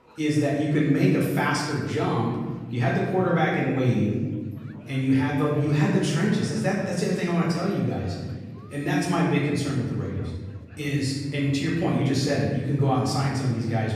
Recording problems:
off-mic speech; far
room echo; noticeable; dies away in 1.5 s
murmuring crowd; faint; throughout; 25 dB below the speech

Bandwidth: 14.5 kHz